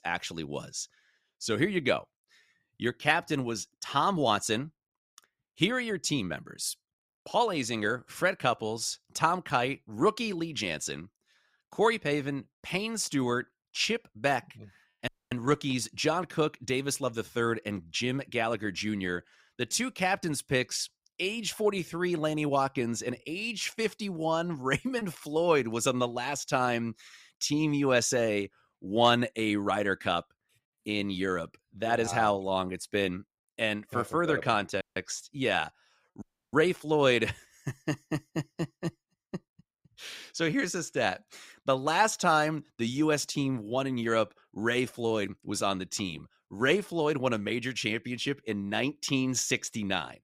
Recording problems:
audio cutting out; at 15 s, at 35 s and at 36 s

